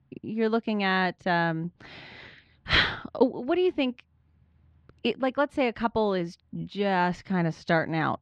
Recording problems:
muffled; very slightly; fading above 4 kHz

